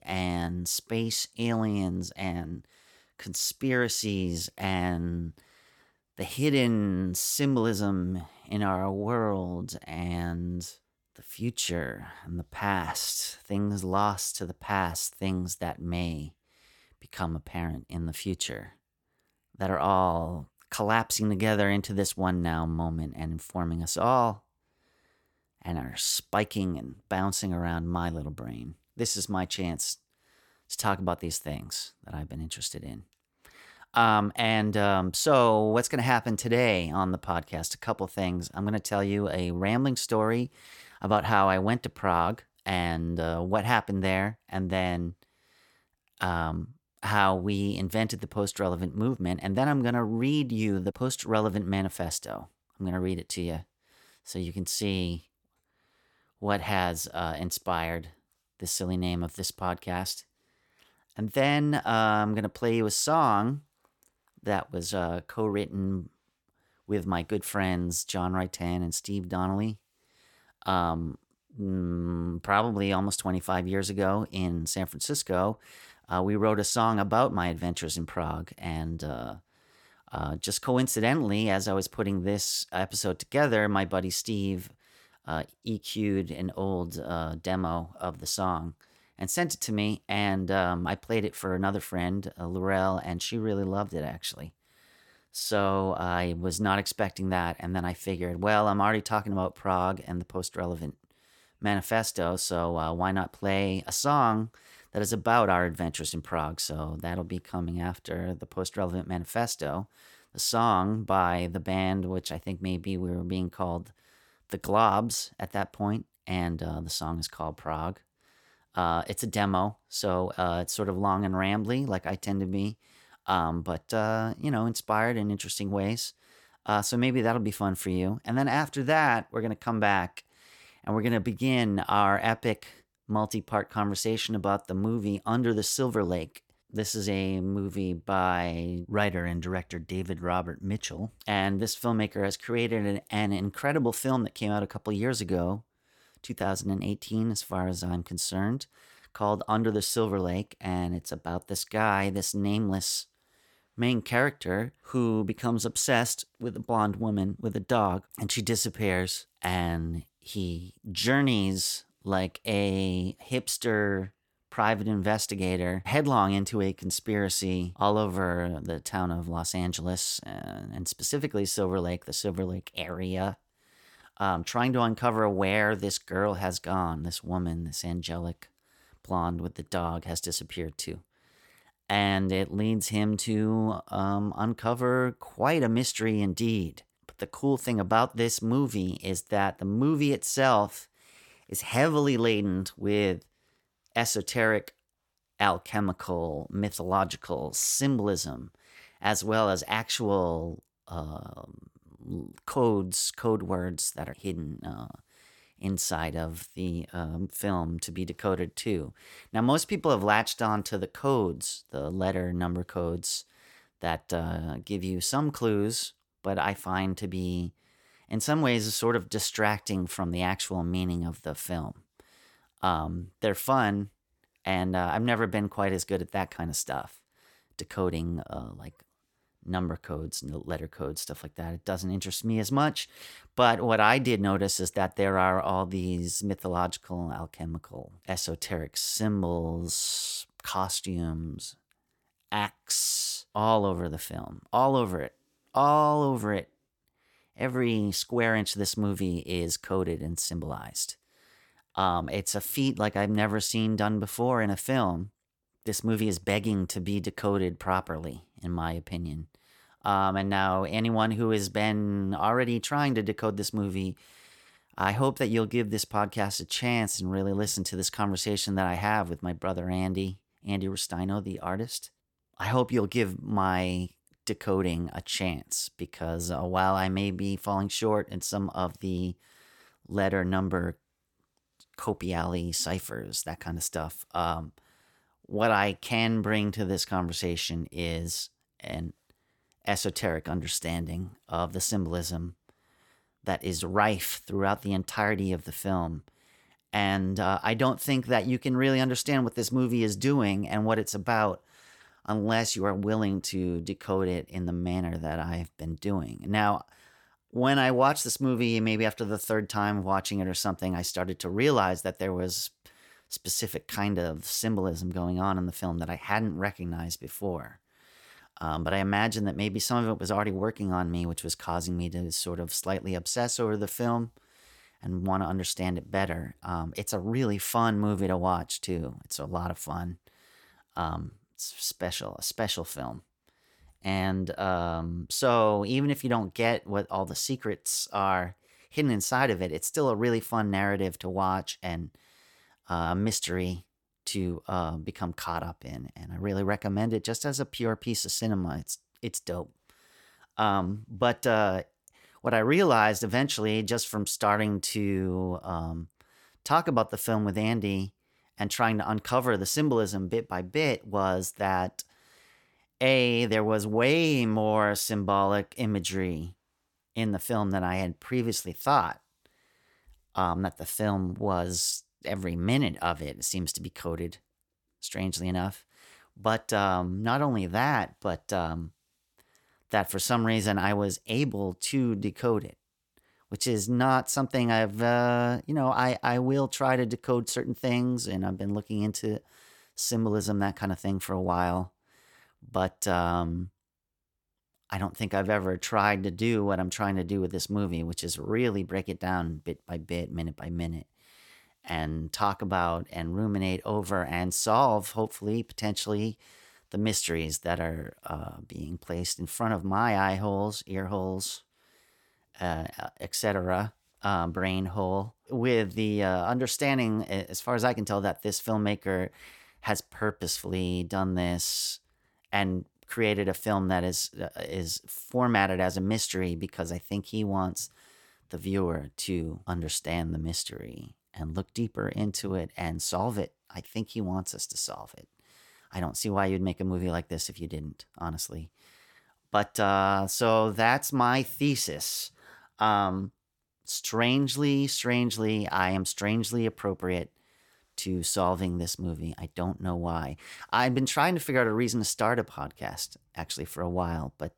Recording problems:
none

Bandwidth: 17.5 kHz